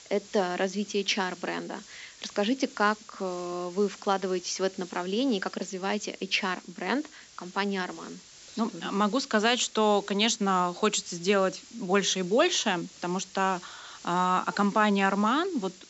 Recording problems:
high frequencies cut off; noticeable; nothing above 7.5 kHz
hiss; faint; throughout; 20 dB below the speech

